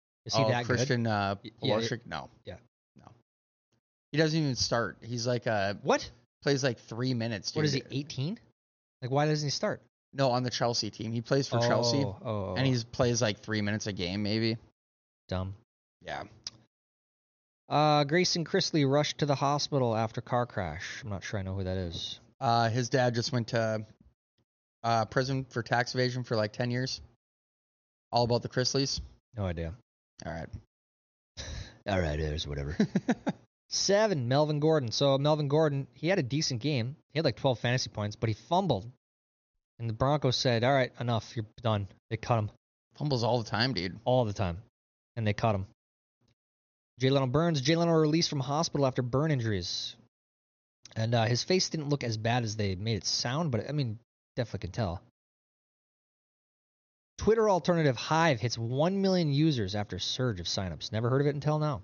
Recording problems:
high frequencies cut off; noticeable; nothing above 6.5 kHz

